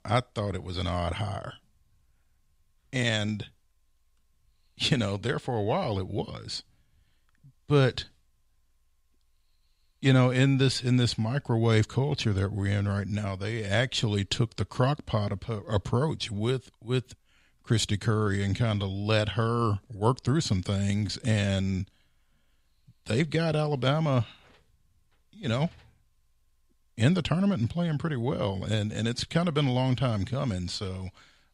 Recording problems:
none

